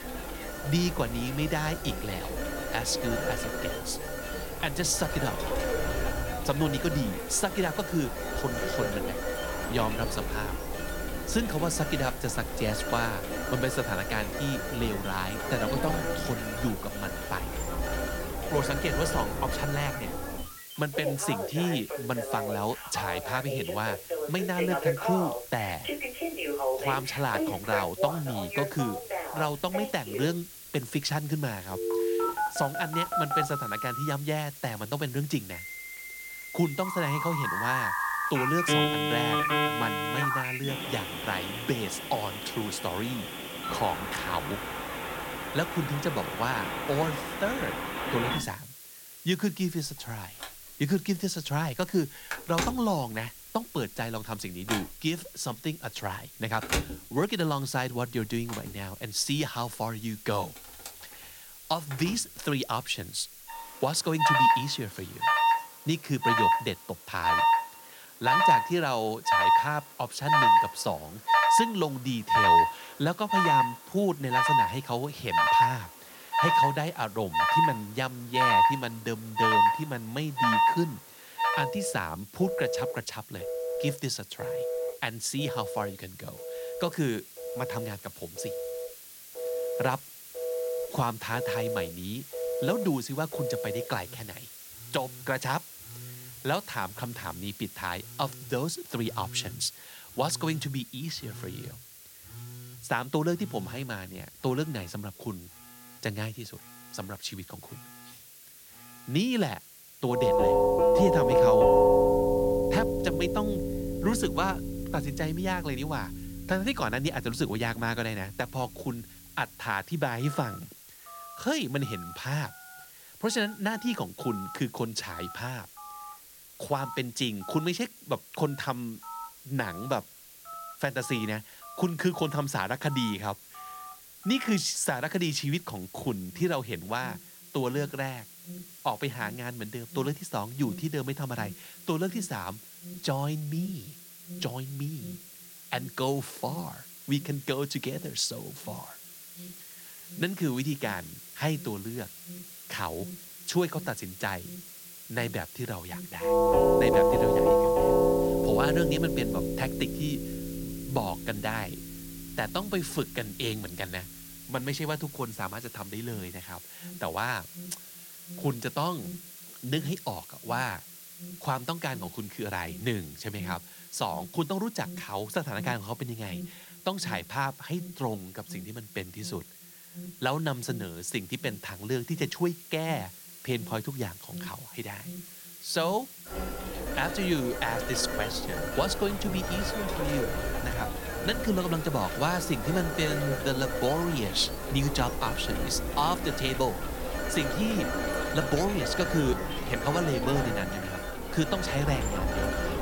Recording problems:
alarms or sirens; very loud; throughout; 3 dB above the speech
hiss; noticeable; throughout; 15 dB below the speech

